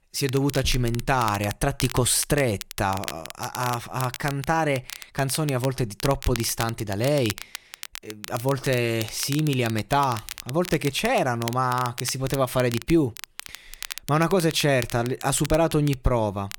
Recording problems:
crackle, like an old record; noticeable; 15 dB below the speech

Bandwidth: 18 kHz